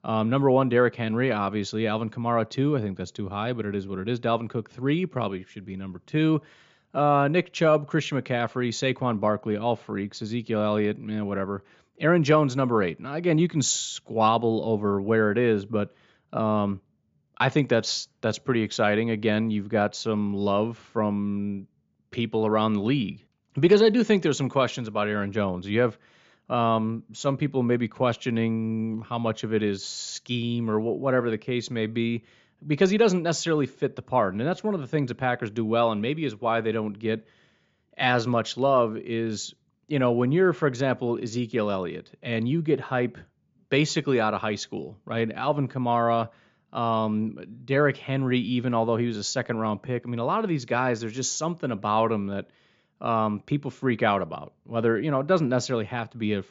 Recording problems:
high frequencies cut off; noticeable; nothing above 7.5 kHz

